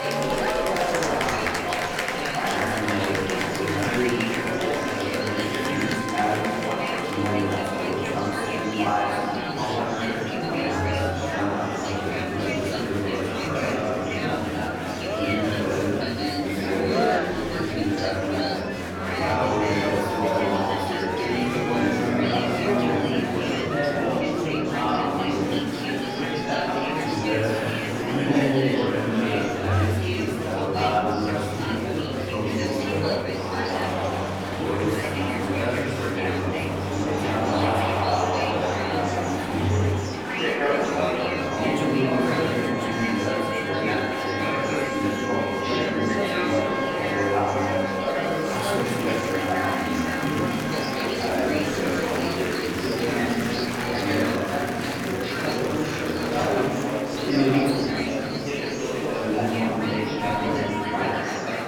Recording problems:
off-mic speech; far
room echo; noticeable; dies away in 1.6 s
murmuring crowd; very loud; throughout; 3 dB above the speech
background music; loud; throughout; 4 dB below the speech

